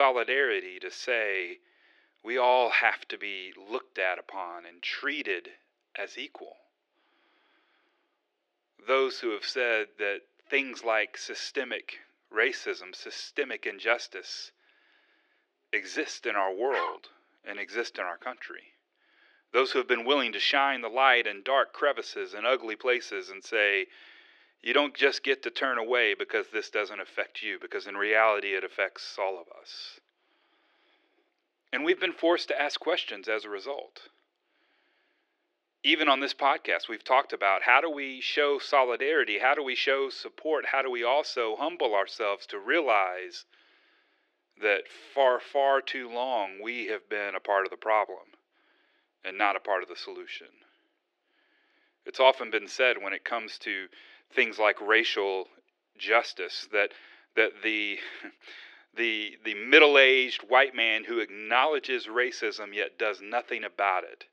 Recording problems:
thin; very; fading below 350 Hz
muffled; slightly; fading above 2.5 kHz
abrupt cut into speech; at the start
dog barking; noticeable; at 17 s; peak 6 dB below the speech

